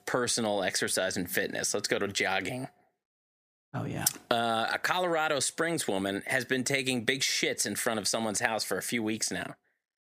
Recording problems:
squashed, flat; heavily

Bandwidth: 15 kHz